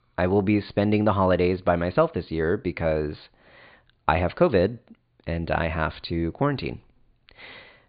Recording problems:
high frequencies cut off; severe; nothing above 4.5 kHz

